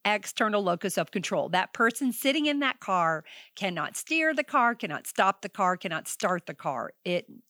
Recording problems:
none

